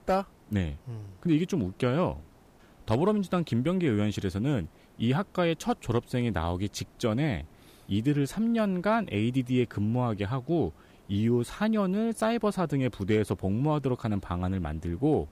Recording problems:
hiss; faint; throughout; 30 dB below the speech

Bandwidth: 15 kHz